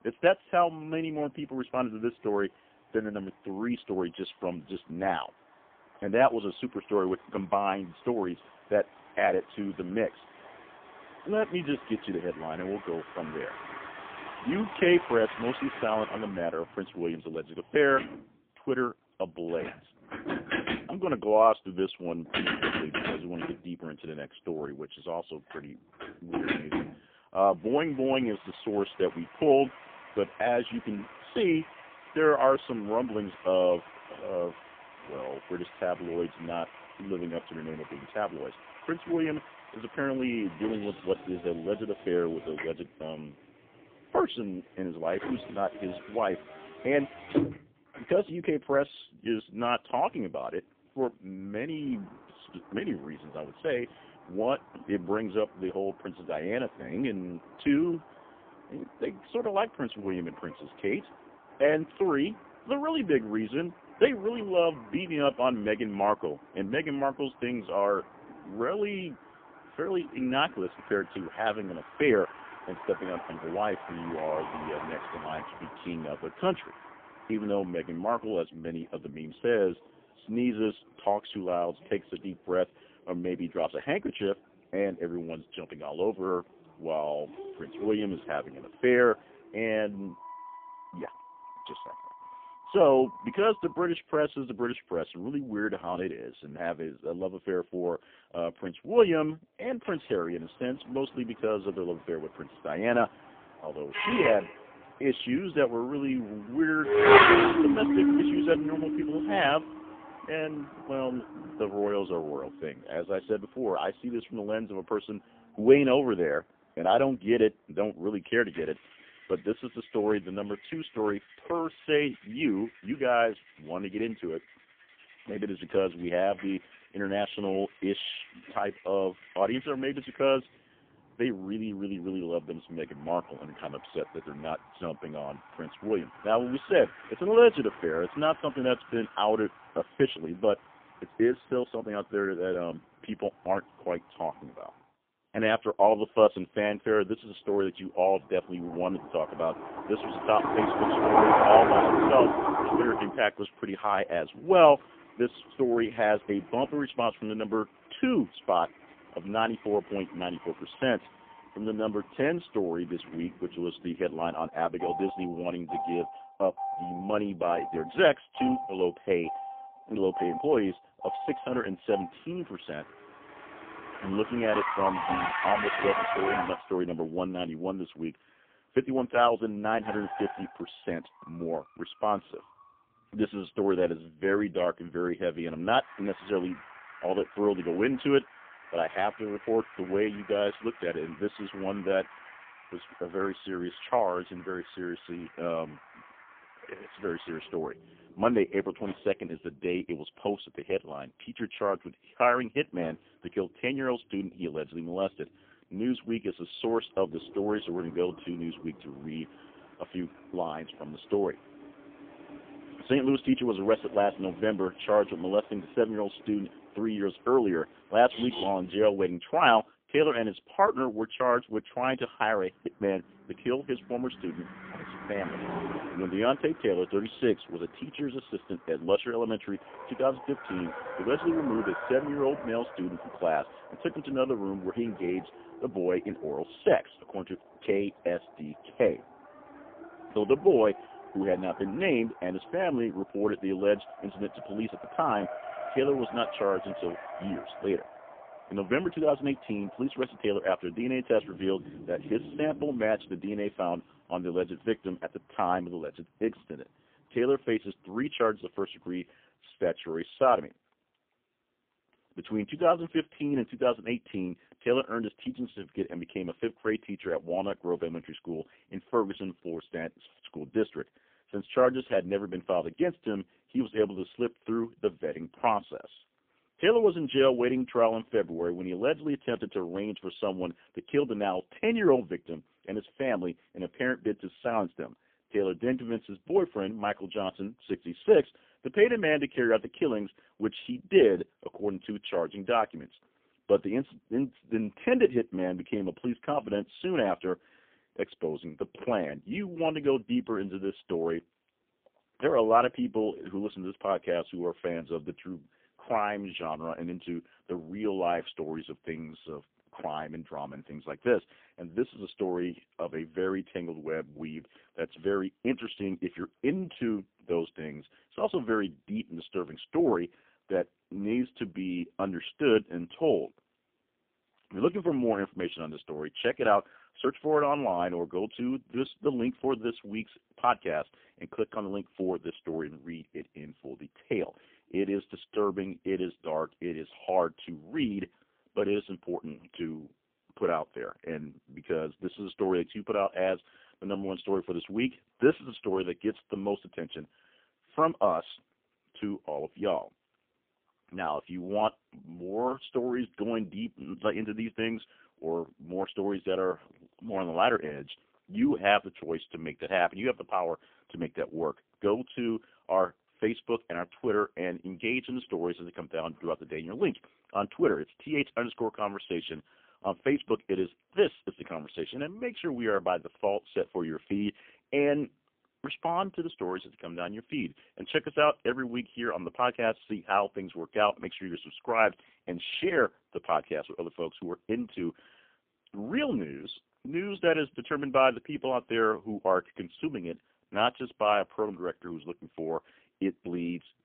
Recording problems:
phone-call audio; poor line; nothing above 3.5 kHz
traffic noise; loud; until 4:19; 4 dB below the speech

